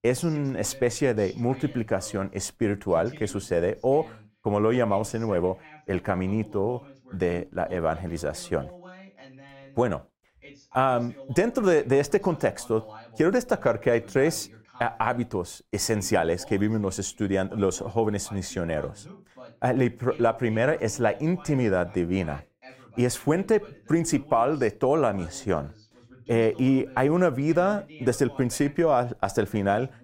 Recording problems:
voice in the background; faint; throughout; 20 dB below the speech

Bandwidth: 16 kHz